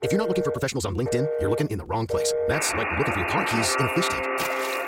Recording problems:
wrong speed, natural pitch; too fast; 1.6 times normal speed
alarms or sirens; very loud; throughout; 1 dB above the speech

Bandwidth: 16 kHz